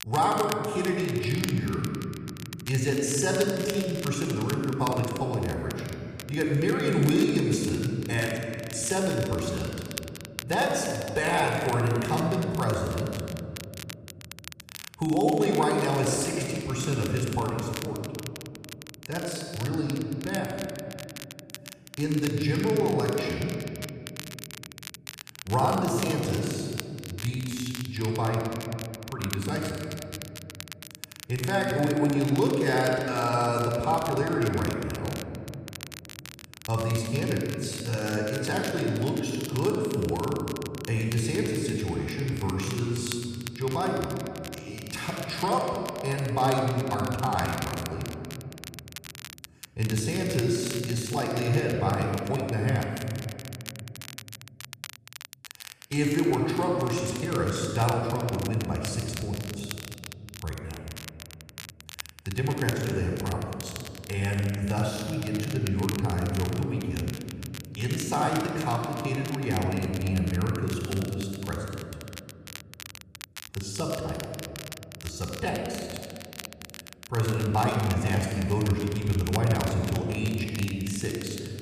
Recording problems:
room echo; noticeable; dies away in 2.3 s
off-mic speech; somewhat distant
crackle, like an old record; noticeable; 15 dB below the speech

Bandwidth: 14.5 kHz